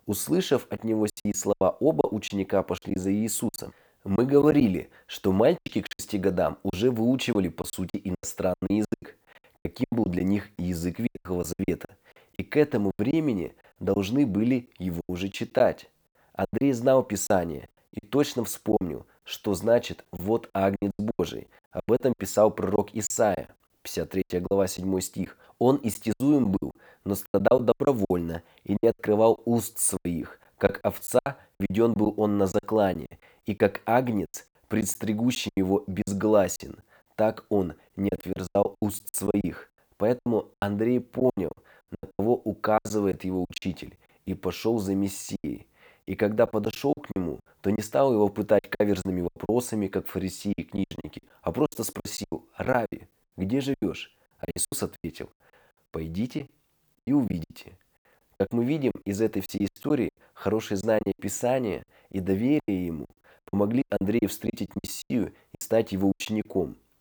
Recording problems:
choppy; very; 15% of the speech affected

